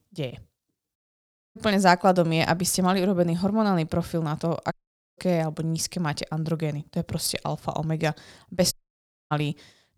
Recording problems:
audio cutting out; at 1 s for 0.5 s, at 4.5 s and at 8.5 s for 0.5 s

